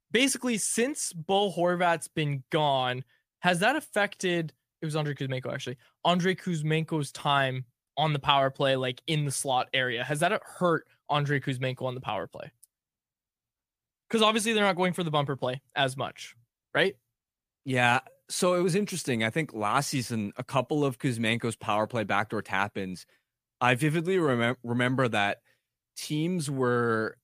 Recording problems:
none

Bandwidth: 15 kHz